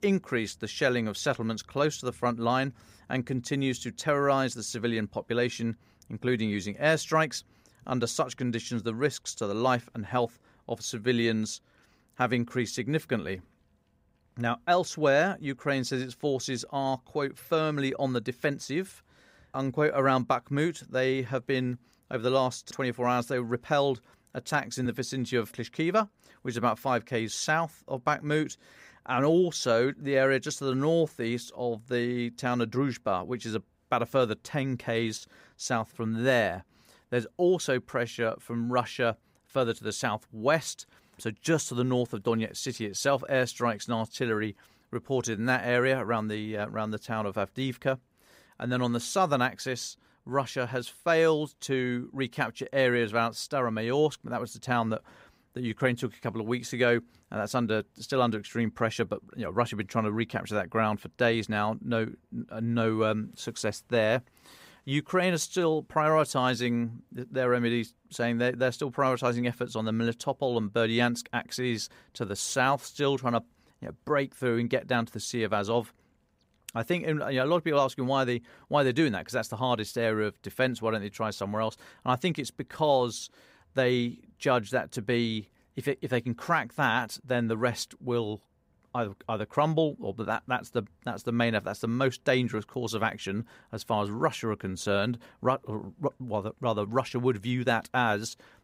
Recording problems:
none

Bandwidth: 15.5 kHz